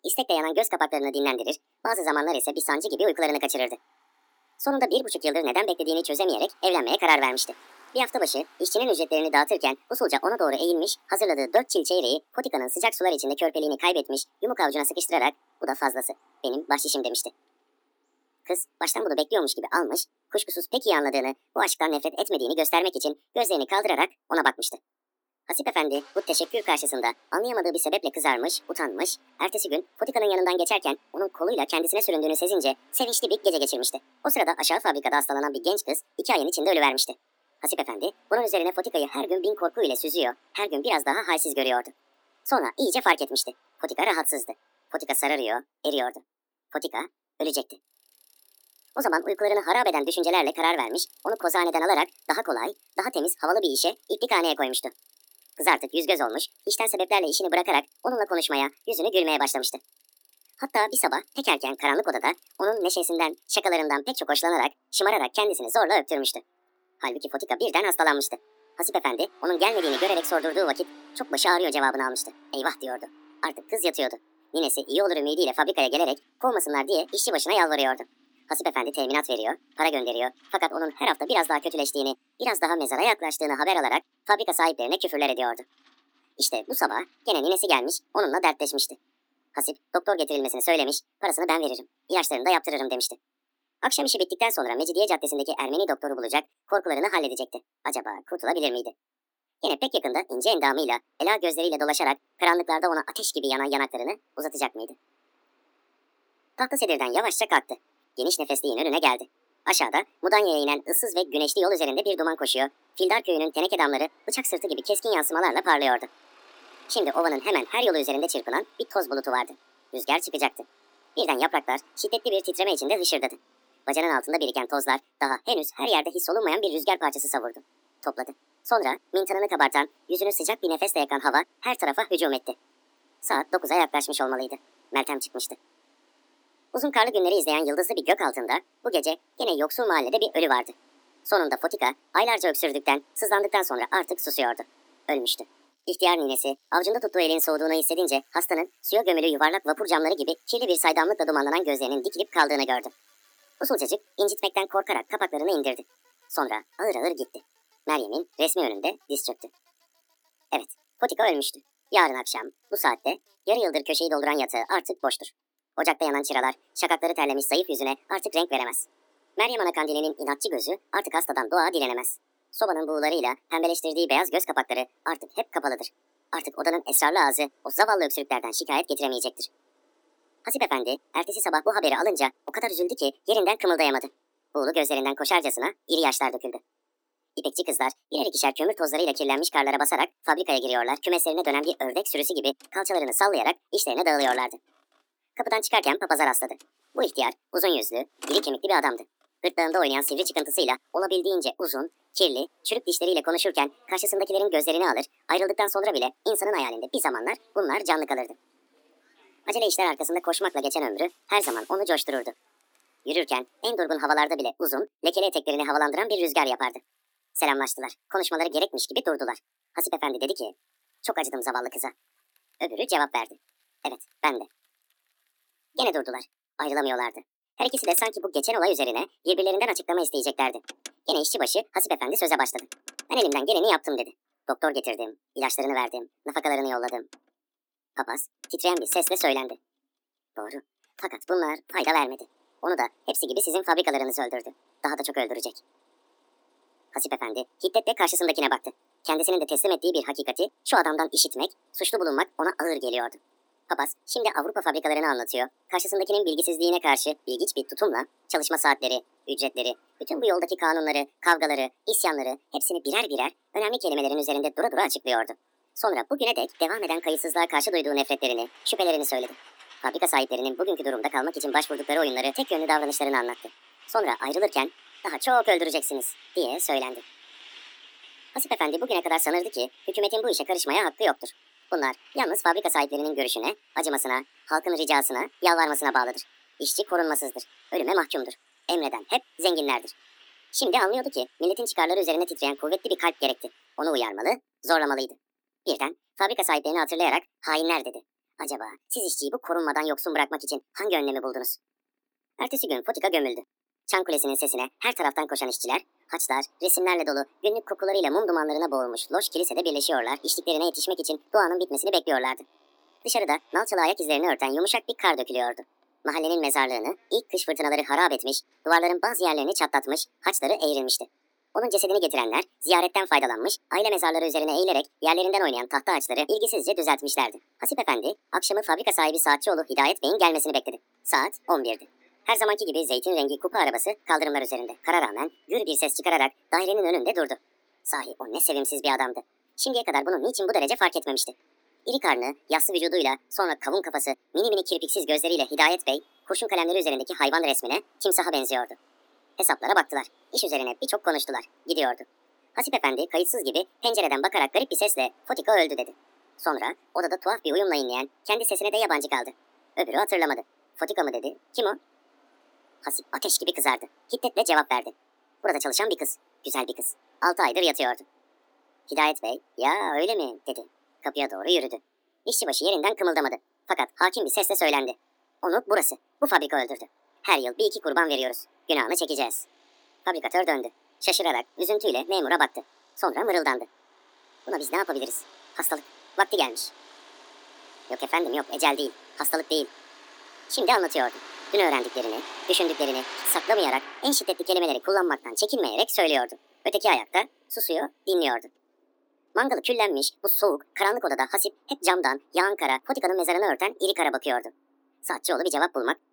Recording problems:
wrong speed and pitch; too fast and too high; 1.5 times normal speed
thin; very slightly; fading below 250 Hz
traffic noise; faint; throughout; 25 dB below the speech

